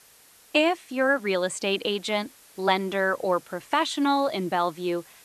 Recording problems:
hiss; faint; throughout; 25 dB below the speech

